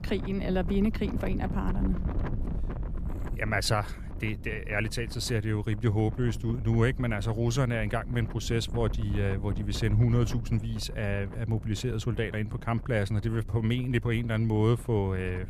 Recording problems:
wind noise on the microphone; occasional gusts; 15 dB below the speech

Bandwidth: 14.5 kHz